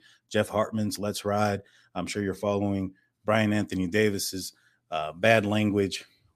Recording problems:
none

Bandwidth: 14.5 kHz